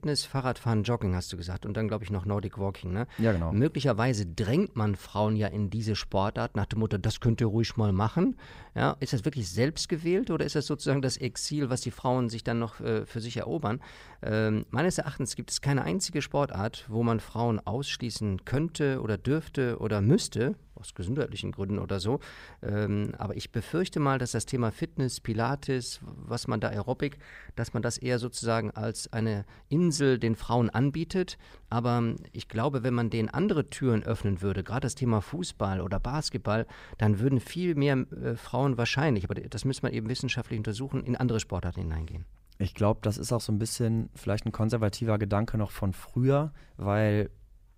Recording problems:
none

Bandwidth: 15.5 kHz